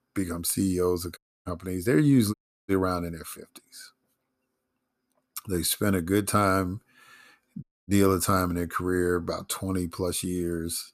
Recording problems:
audio cutting out; at 1 s, at 2.5 s and at 7.5 s

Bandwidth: 14.5 kHz